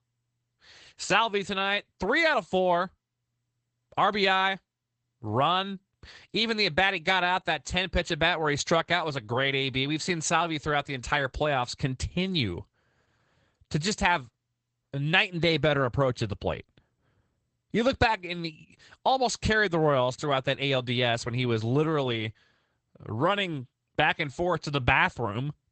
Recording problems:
garbled, watery; badly; nothing above 8 kHz

